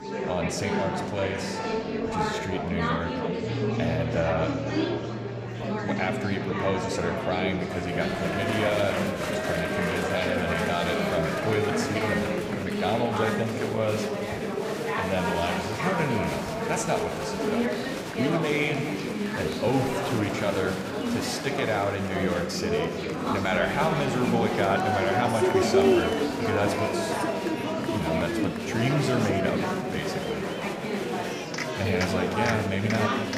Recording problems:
room echo; slight; dies away in 1.8 s
murmuring crowd; very loud; throughout; as loud as the speech
background music; loud; until 11 s; 9 dB below the speech

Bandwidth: 15 kHz